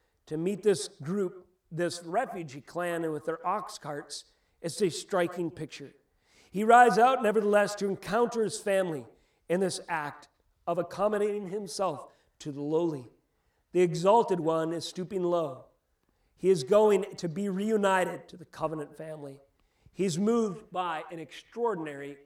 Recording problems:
echo of what is said; noticeable; throughout; 120 ms later, 15 dB below the speech

